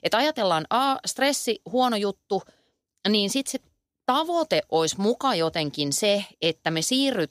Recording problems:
none

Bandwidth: 15 kHz